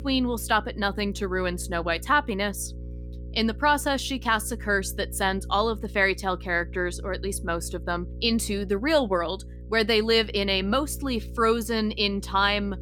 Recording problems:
electrical hum; faint; throughout; 60 Hz, 25 dB below the speech

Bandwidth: 17.5 kHz